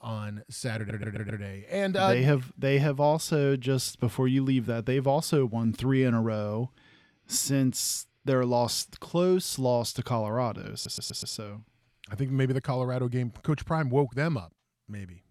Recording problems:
audio stuttering; at 1 s and at 11 s

